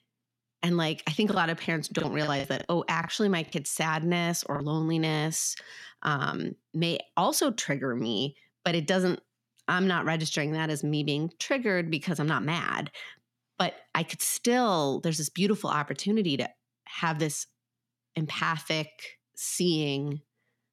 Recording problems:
choppy; very; from 1.5 to 4.5 s; 8% of the speech affected

